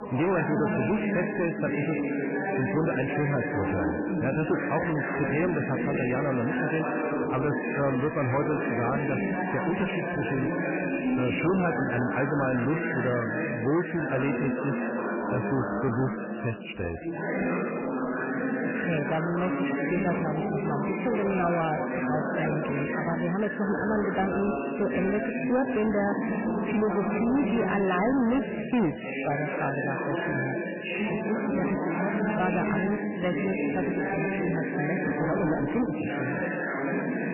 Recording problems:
garbled, watery; badly; nothing above 3 kHz
distortion; slight; 10 dB below the speech
chatter from many people; loud; throughout; as loud as the speech

